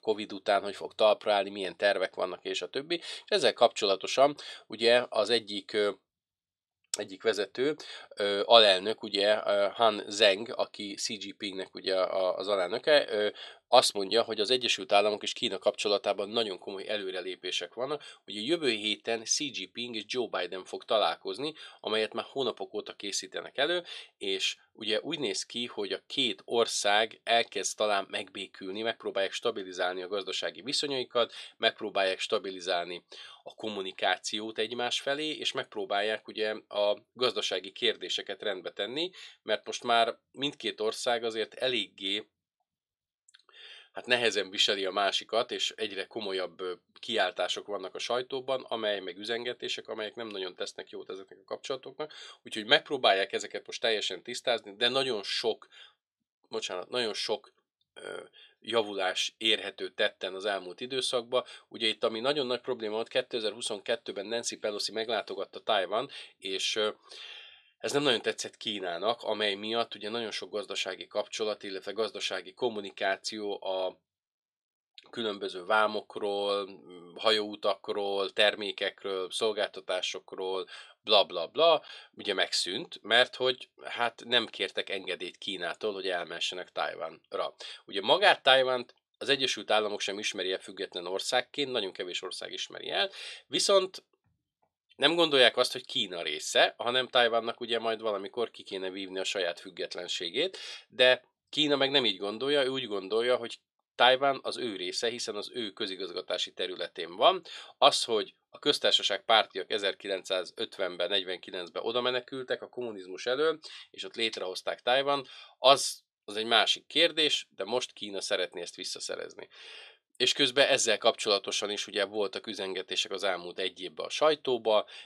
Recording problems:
thin; somewhat; fading below 350 Hz

